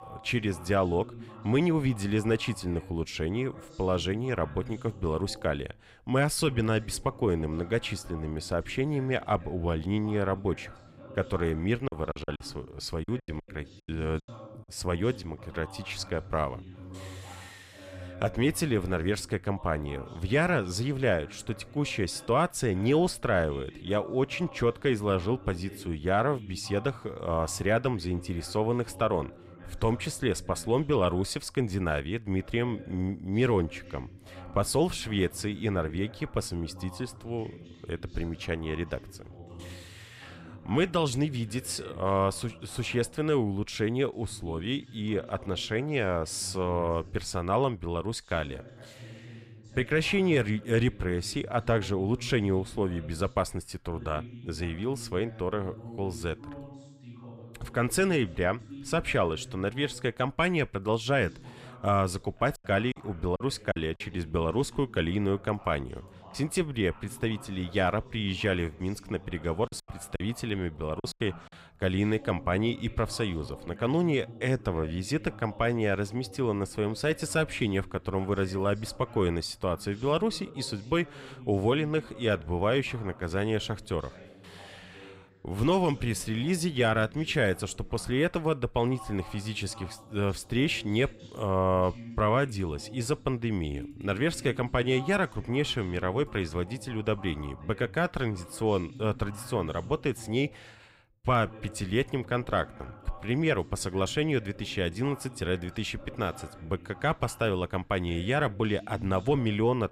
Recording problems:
voice in the background; noticeable; throughout; 20 dB below the speech
choppy; very; from 12 to 14 s, from 1:03 to 1:04 and from 1:10 to 1:11; 11% of the speech affected

